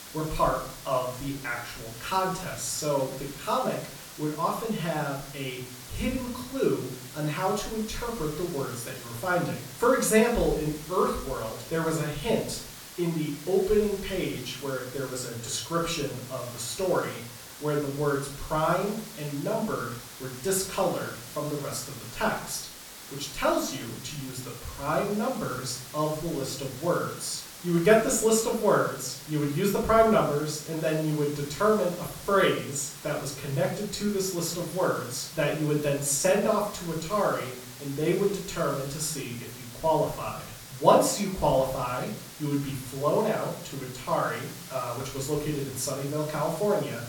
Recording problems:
off-mic speech; far
room echo; slight; dies away in 0.5 s
hiss; noticeable; throughout; 15 dB below the speech

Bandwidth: 18 kHz